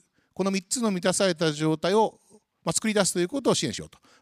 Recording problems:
uneven, jittery; strongly

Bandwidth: 15 kHz